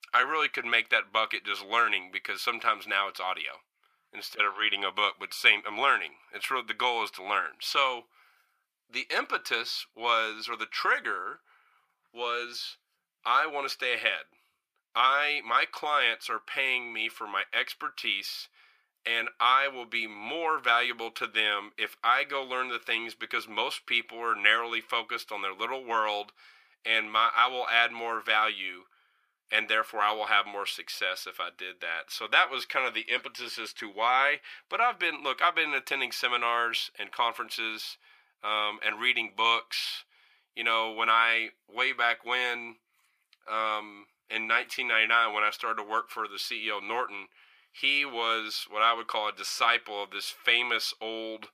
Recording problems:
thin; very; fading below 750 Hz

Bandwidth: 15 kHz